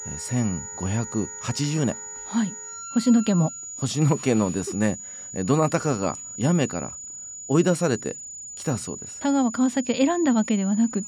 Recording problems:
high-pitched whine; noticeable; throughout; 7 kHz, 10 dB below the speech
background music; faint; until 3.5 s; 20 dB below the speech

